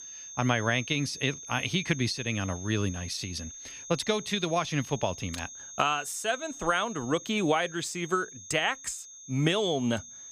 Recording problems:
high-pitched whine; noticeable; throughout; 6.5 kHz, 10 dB below the speech

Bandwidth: 14.5 kHz